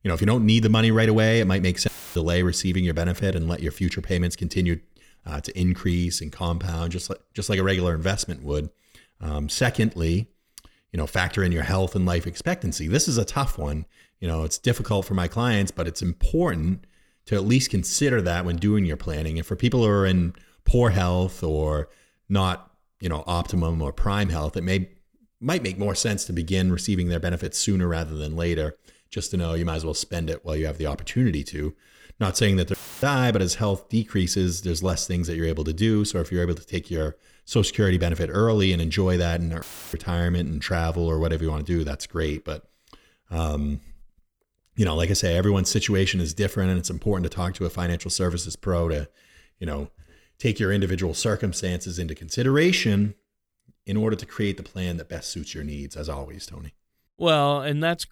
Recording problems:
audio cutting out; filled with static; at 2 s, at 33 s and at 40 s

